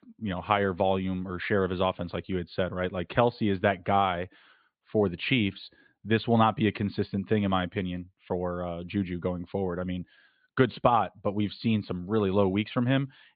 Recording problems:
high frequencies cut off; severe; nothing above 4.5 kHz

